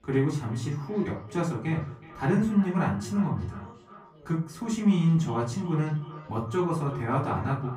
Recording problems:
off-mic speech; far
echo of what is said; faint; throughout; 370 ms later, 20 dB below the speech
room echo; slight; dies away in 0.3 s
background chatter; faint; throughout; 4 voices, 30 dB below the speech

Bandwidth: 15.5 kHz